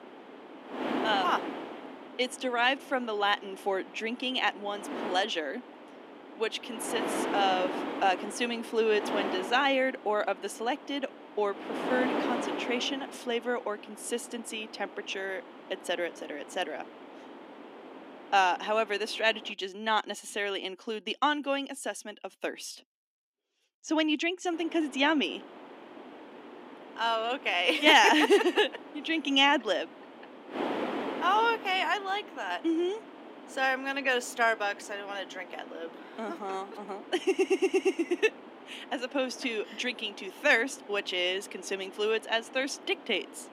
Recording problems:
thin; very slightly; fading below 250 Hz
wind noise on the microphone; occasional gusts; until 20 s and from 25 s on; 10 dB below the speech
audio stuttering; at 37 s

